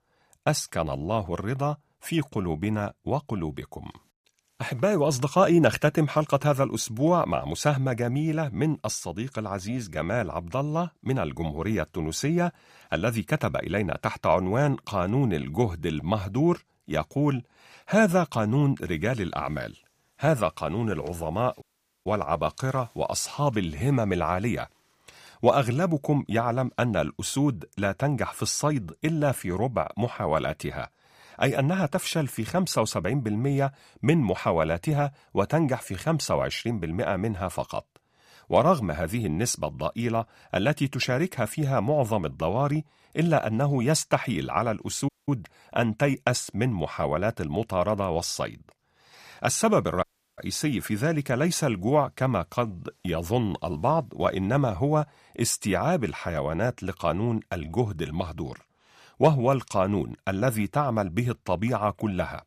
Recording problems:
audio cutting out; at 22 s, at 45 s and at 50 s

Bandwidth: 15 kHz